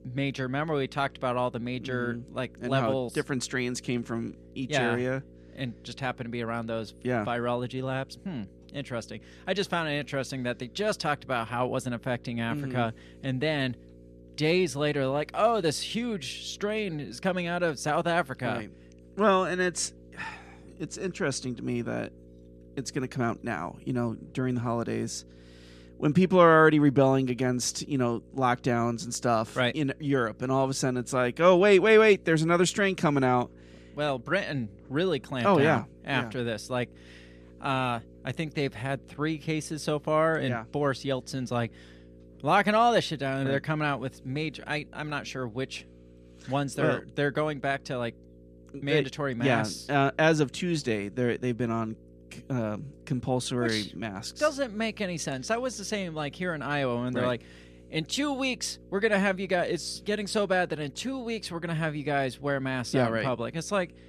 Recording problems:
electrical hum; faint; throughout; 60 Hz, 30 dB below the speech

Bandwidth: 14 kHz